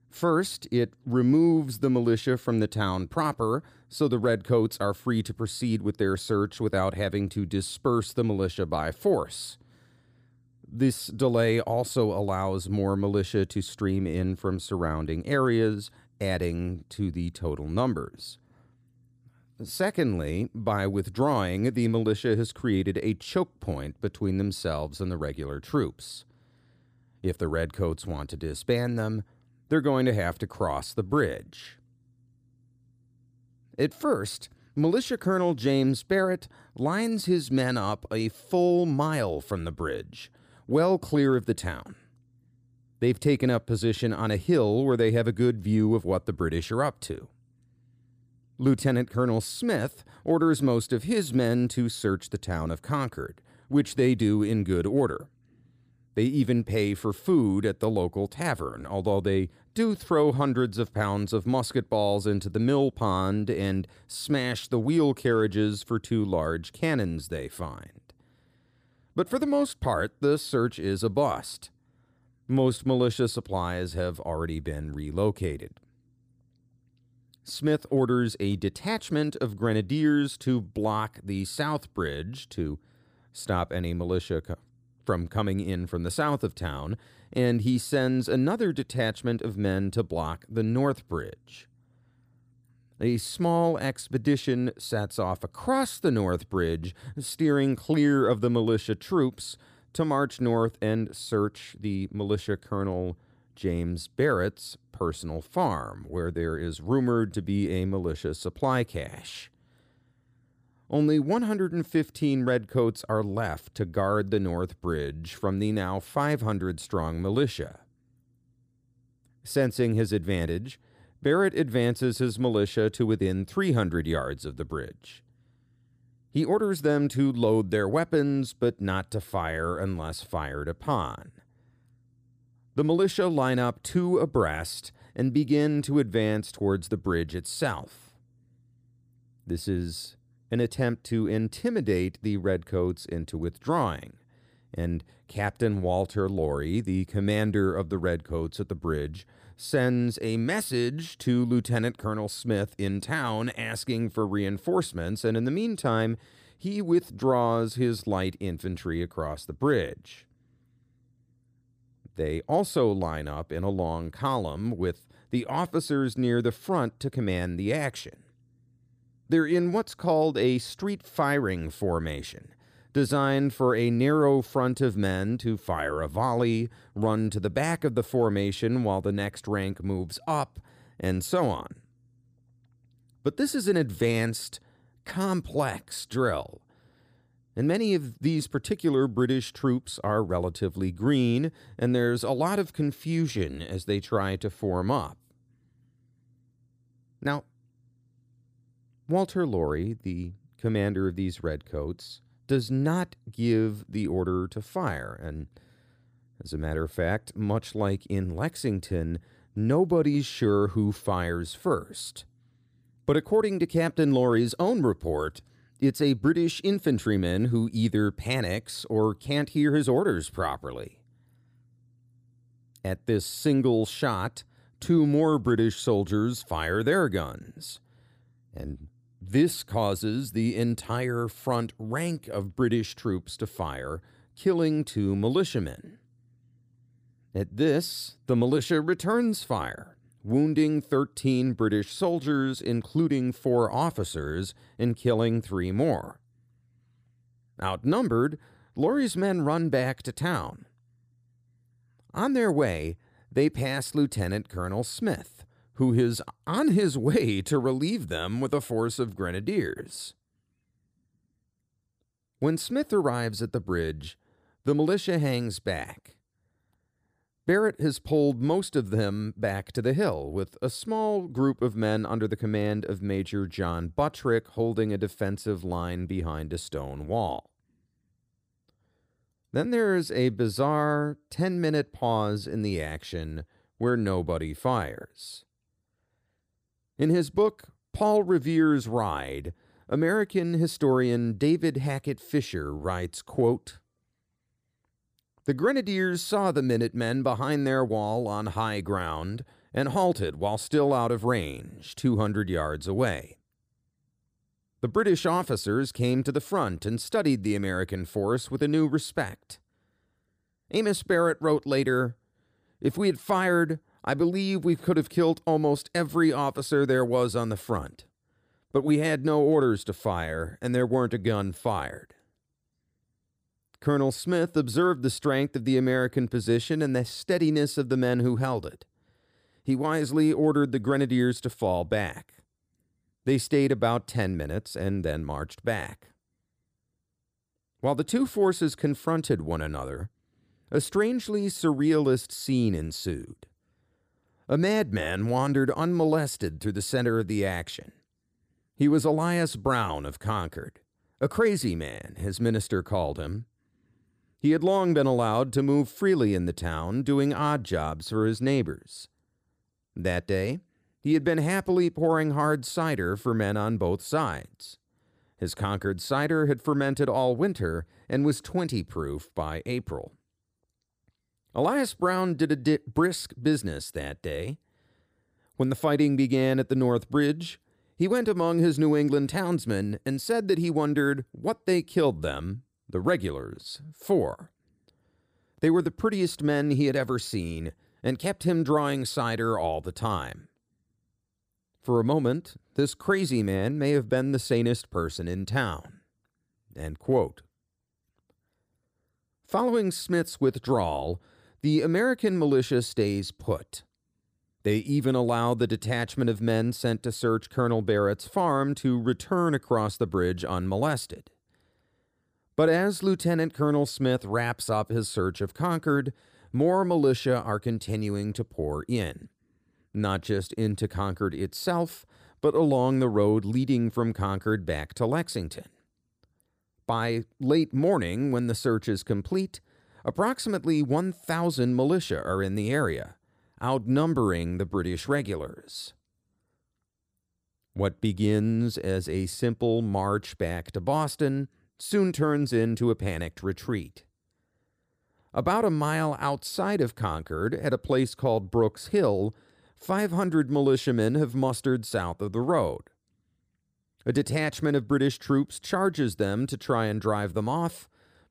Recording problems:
none

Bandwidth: 15 kHz